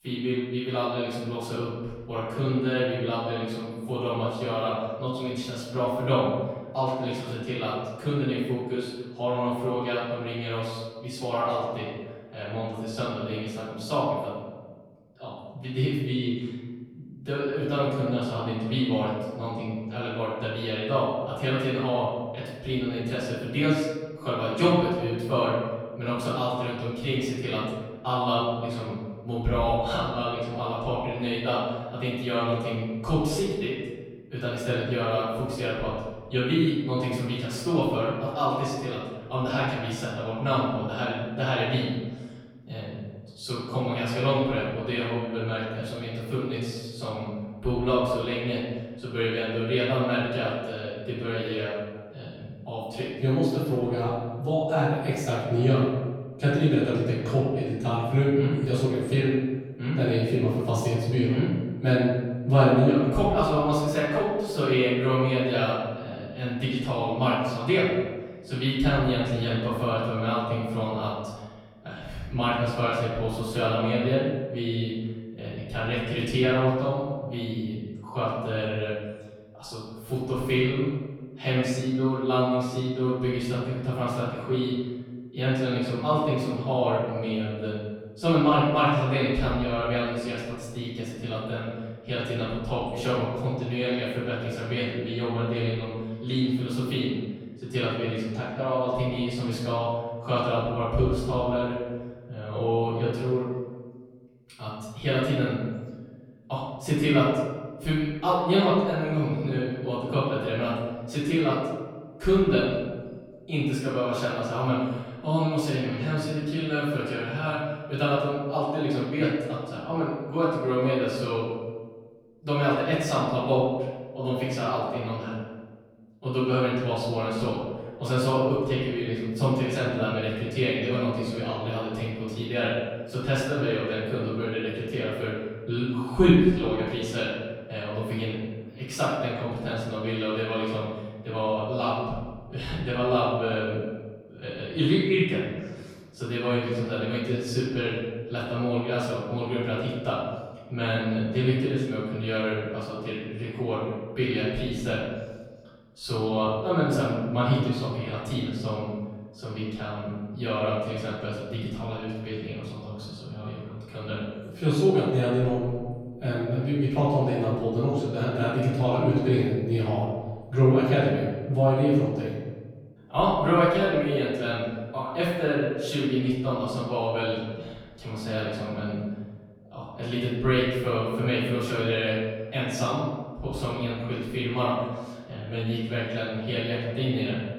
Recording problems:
off-mic speech; far
room echo; noticeable; dies away in 1.3 s

